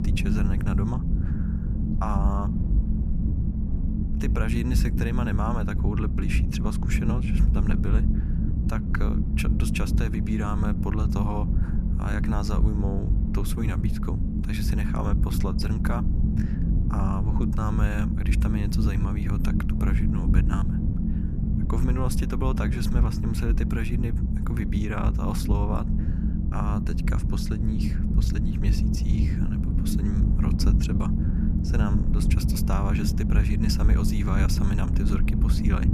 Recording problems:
low rumble; loud; throughout; 2 dB below the speech

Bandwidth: 14.5 kHz